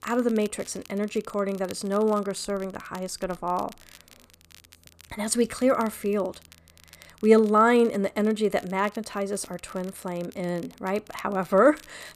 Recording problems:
crackle, like an old record; faint; 25 dB below the speech

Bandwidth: 14.5 kHz